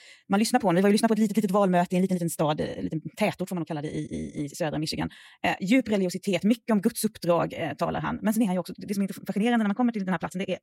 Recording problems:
wrong speed, natural pitch; too fast; 1.8 times normal speed

